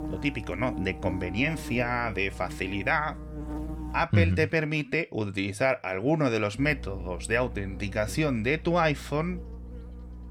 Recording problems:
electrical hum; noticeable; until 4 s and from 6.5 s on; 60 Hz, 15 dB below the speech

